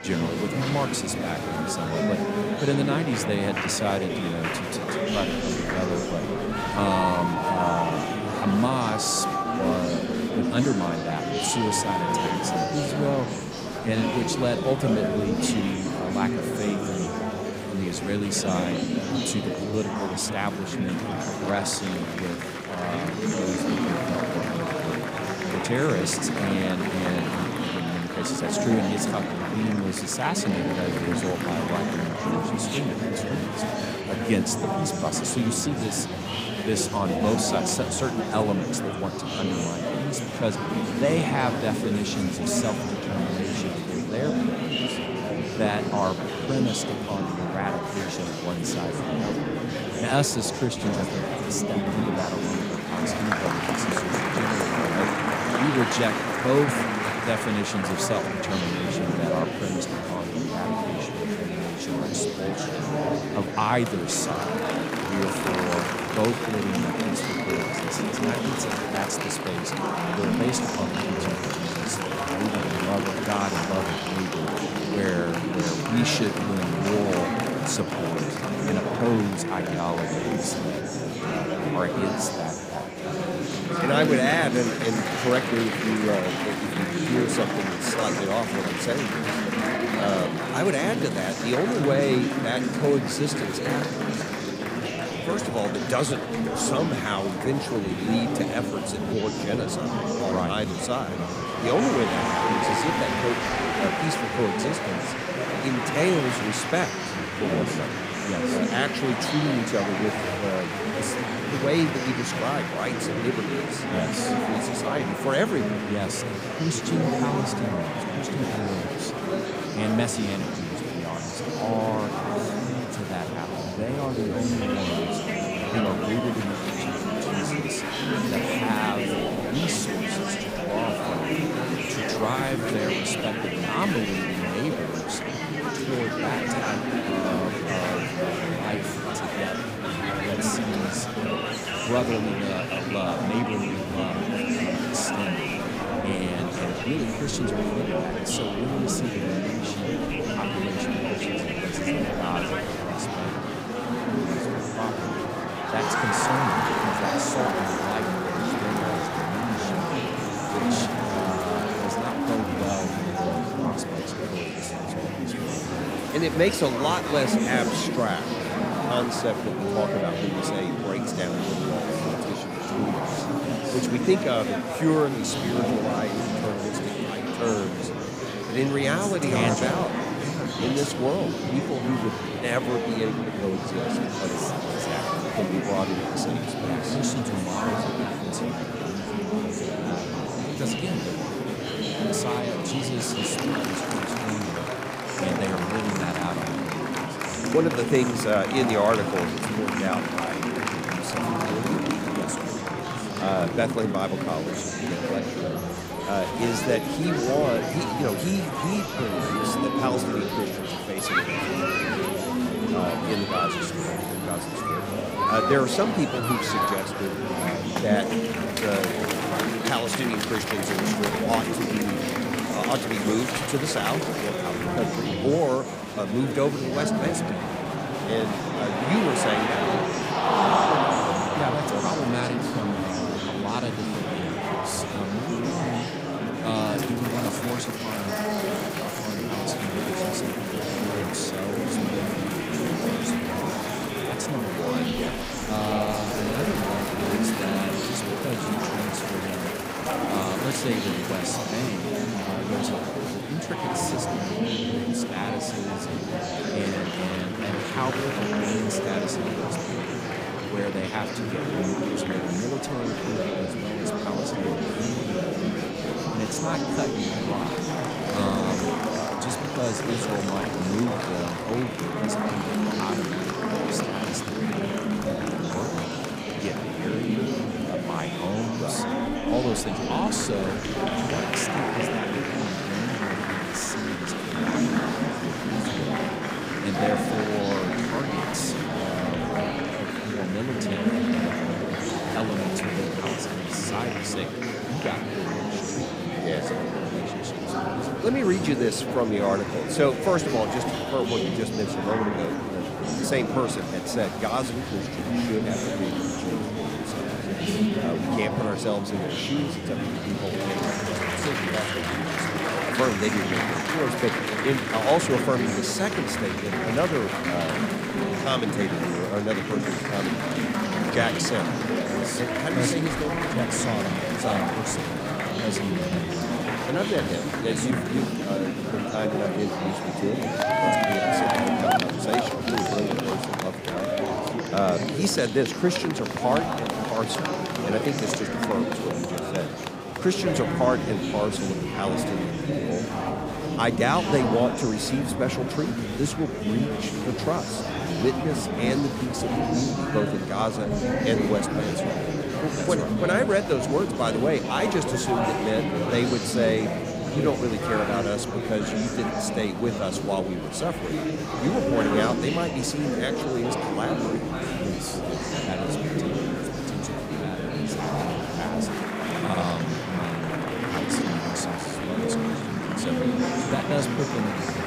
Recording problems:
murmuring crowd; very loud; throughout; 2 dB above the speech

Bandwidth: 15.5 kHz